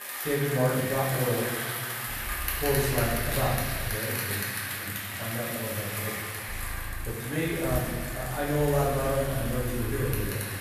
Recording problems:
off-mic speech; far
room echo; noticeable; dies away in 1.3 s
traffic noise; loud; throughout; 3 dB below the speech
low rumble; faint; from 2 to 4 s and from 6.5 s on; 25 dB below the speech

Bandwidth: 14.5 kHz